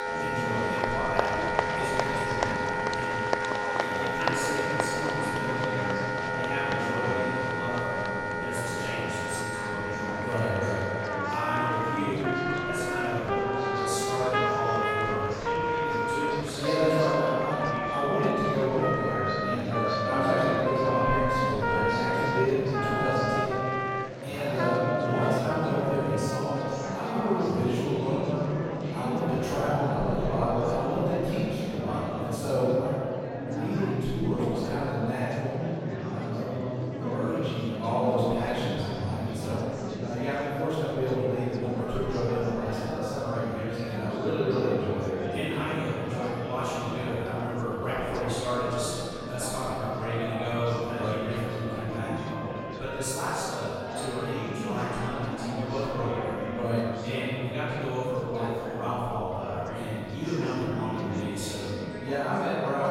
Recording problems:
room echo; strong; dies away in 2.4 s
off-mic speech; far
background music; loud; throughout; 1 dB below the speech
chatter from many people; loud; throughout; 4 dB below the speech

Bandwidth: 16 kHz